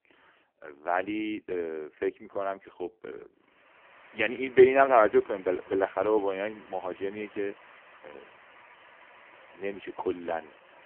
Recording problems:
phone-call audio; poor line; nothing above 3 kHz
traffic noise; faint; from 3.5 s on; 25 dB below the speech

